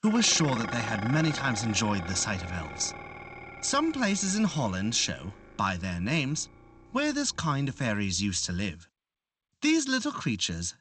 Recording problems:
garbled, watery; slightly; nothing above 8 kHz
clattering dishes; noticeable; until 8 s; peak 6 dB below the speech

